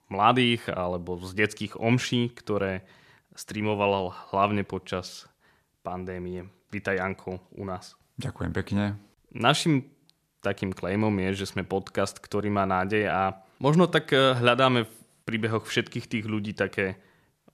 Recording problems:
none

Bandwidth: 14 kHz